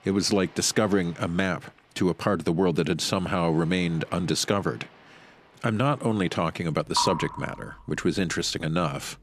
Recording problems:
rain or running water; noticeable; throughout; 10 dB below the speech

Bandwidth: 14.5 kHz